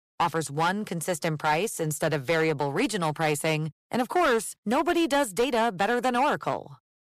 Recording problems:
distortion; slight; 9% of the sound clipped

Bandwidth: 14.5 kHz